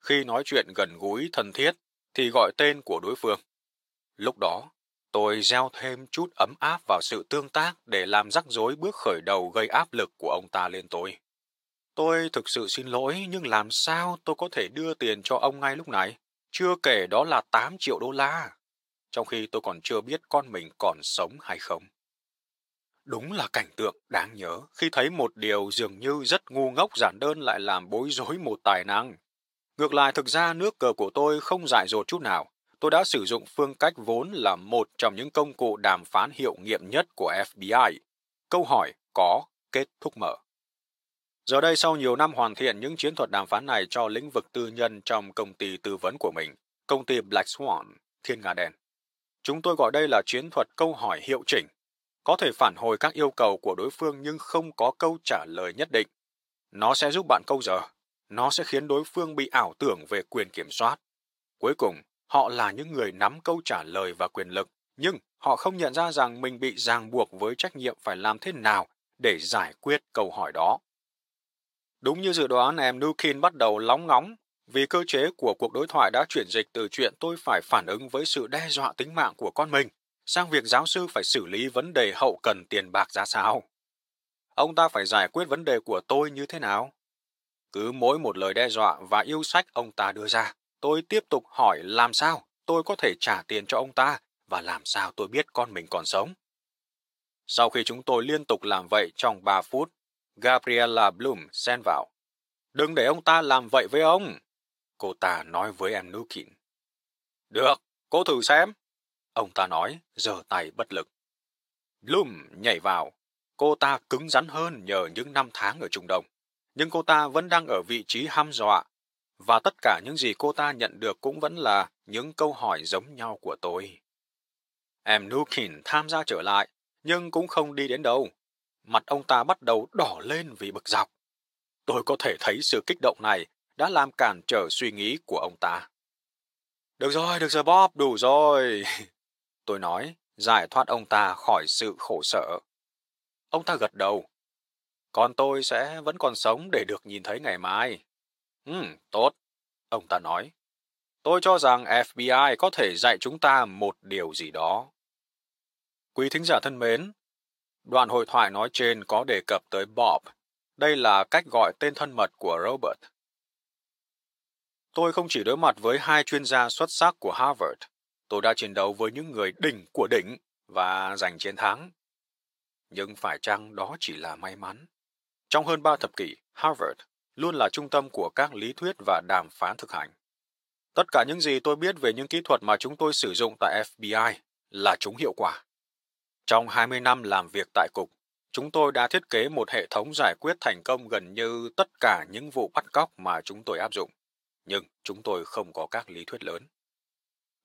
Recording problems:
thin; very; fading below 550 Hz

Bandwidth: 16 kHz